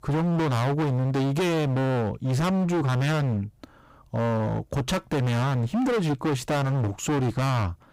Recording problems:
distortion; heavy; 38% of the sound clipped

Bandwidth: 15.5 kHz